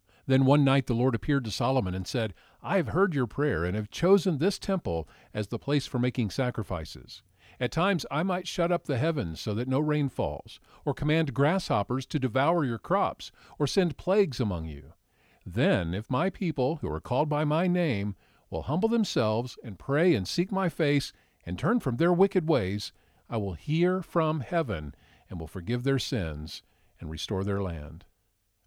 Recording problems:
none

